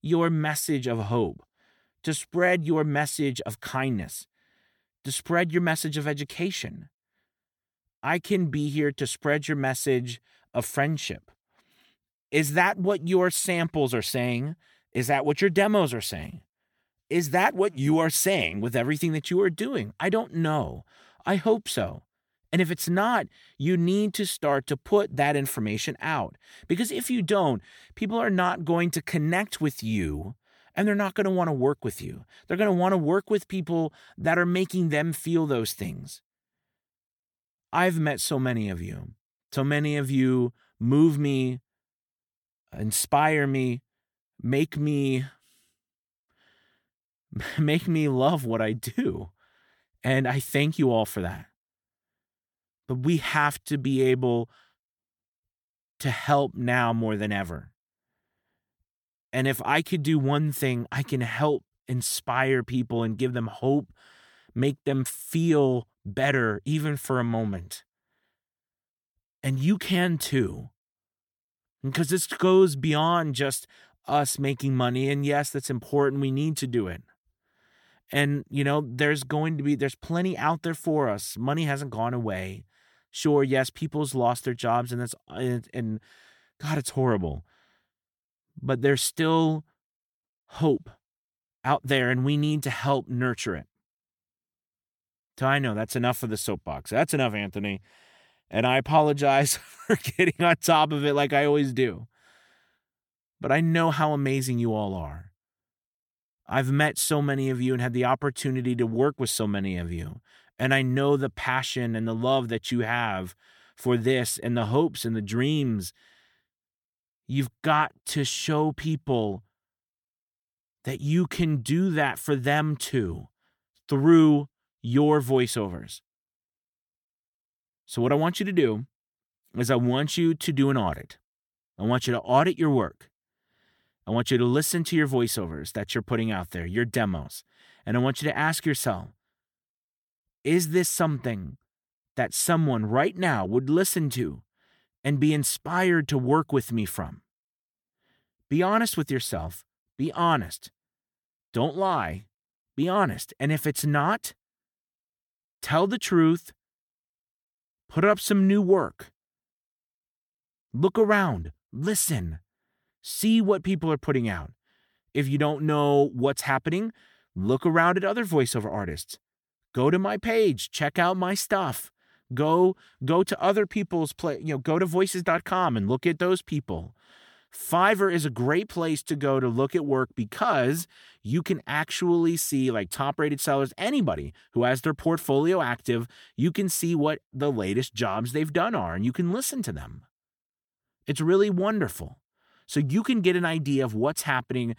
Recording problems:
none

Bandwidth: 18.5 kHz